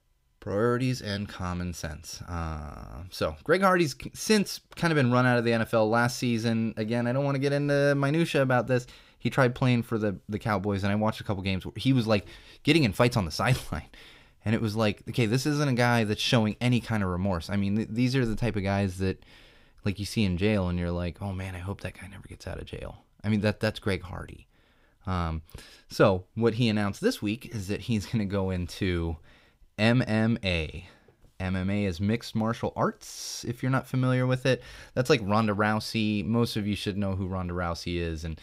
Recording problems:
none

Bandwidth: 15.5 kHz